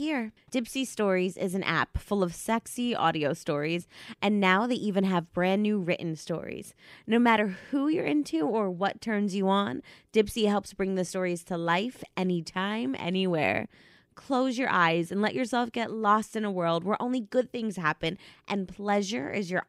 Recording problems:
abrupt cut into speech; at the start

